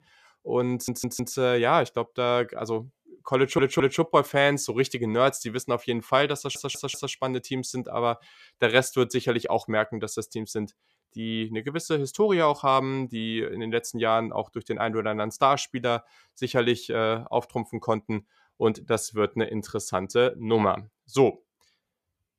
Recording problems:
audio stuttering; at 0.5 s, at 3.5 s and at 6.5 s

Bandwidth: 14.5 kHz